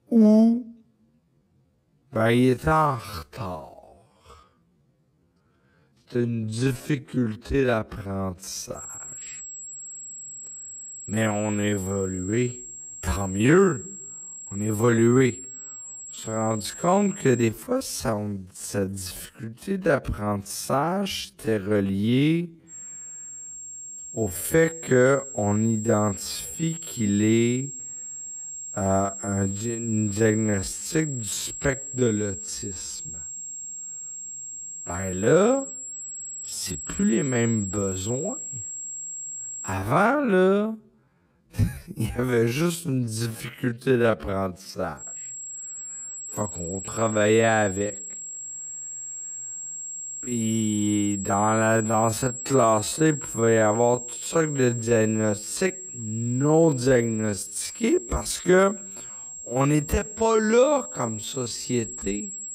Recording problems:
wrong speed, natural pitch; too slow; 0.5 times normal speed
high-pitched whine; loud; from 9 to 17 s, from 23 to 40 s and from 45 s on; 7.5 kHz, 10 dB below the speech

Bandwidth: 15.5 kHz